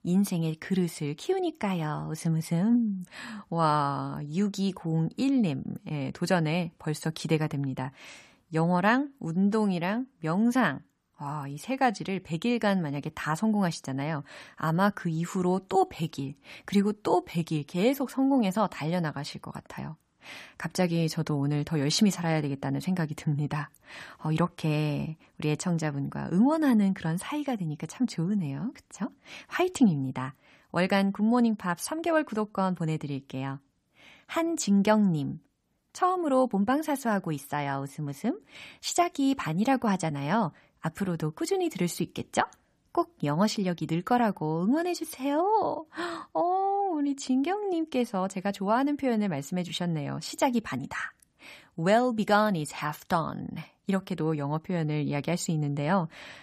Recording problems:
none

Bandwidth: 14.5 kHz